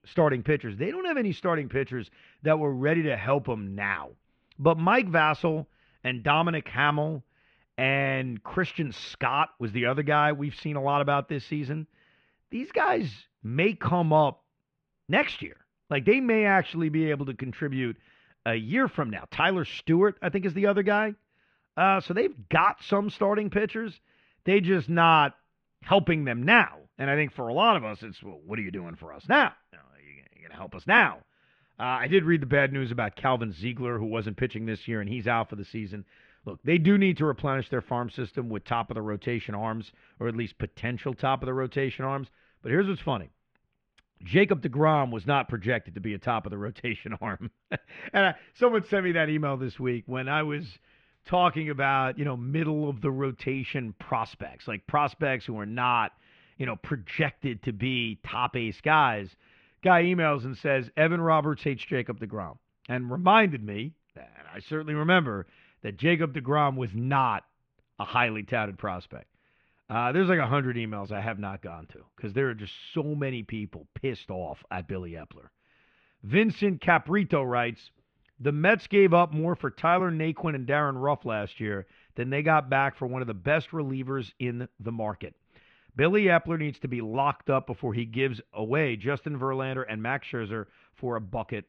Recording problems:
muffled; very; fading above 3 kHz

